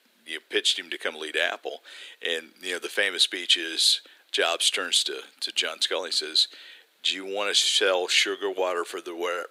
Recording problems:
thin; very; fading below 350 Hz

